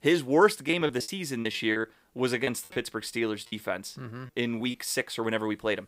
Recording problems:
choppy; very; from 0.5 to 2 s, at 2.5 s and from 3.5 to 4.5 s; 16% of the speech affected

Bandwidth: 15.5 kHz